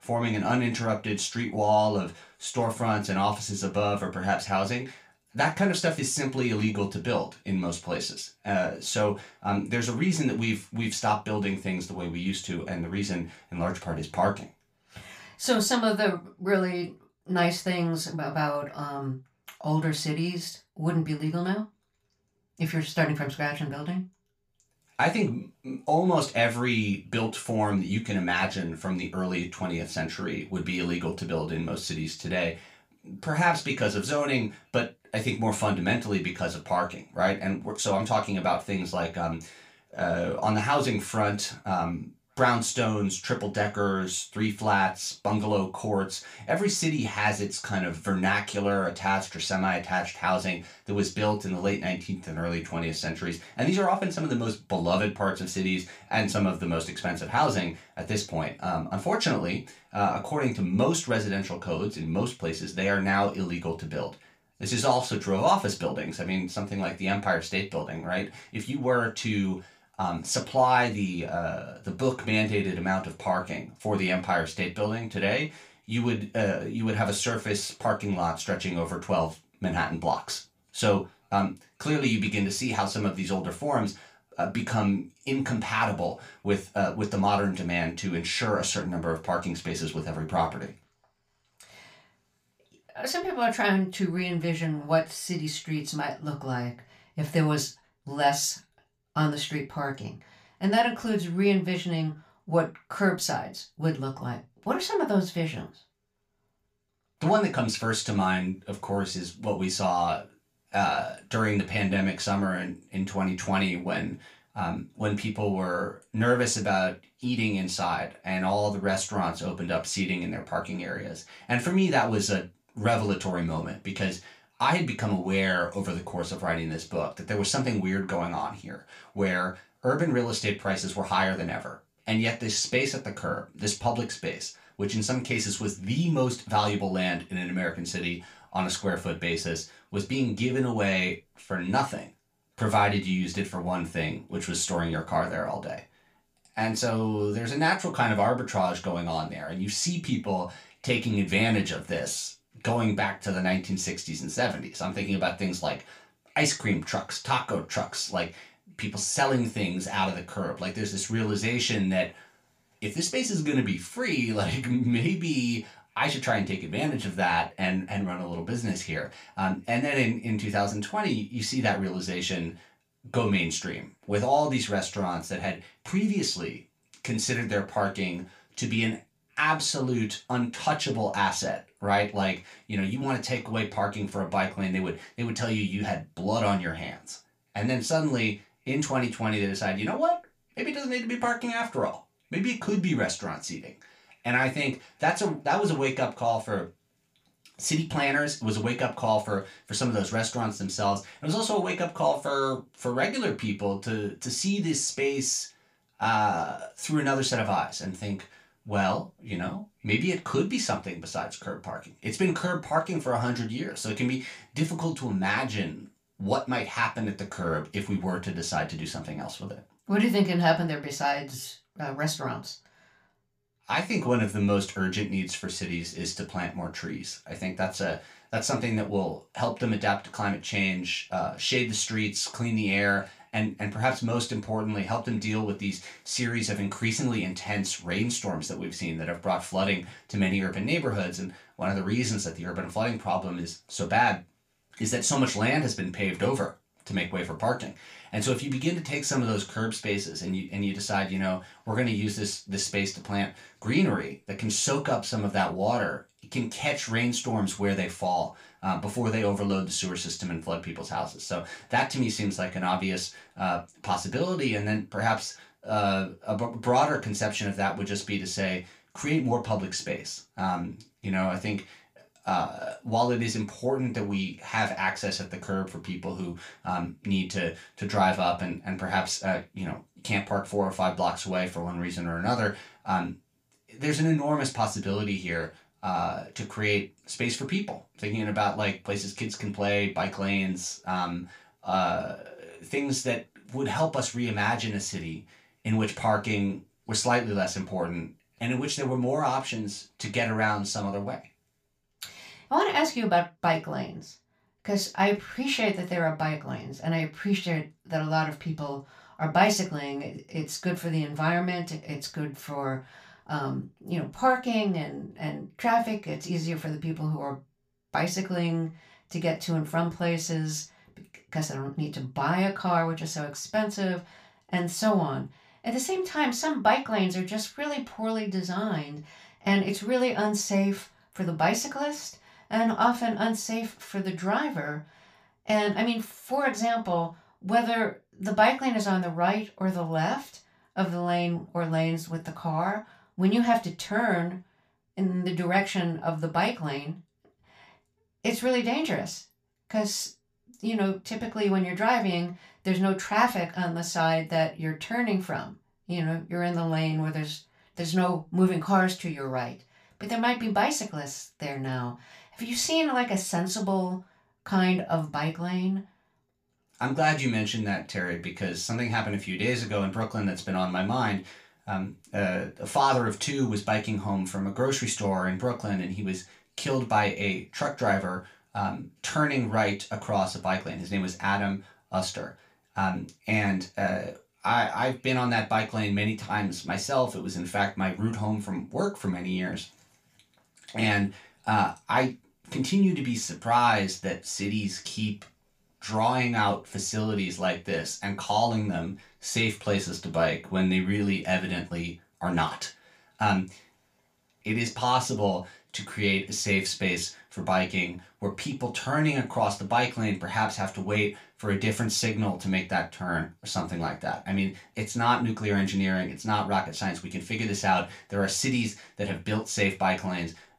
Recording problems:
off-mic speech; far
room echo; very slight; dies away in 0.2 s

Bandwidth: 15 kHz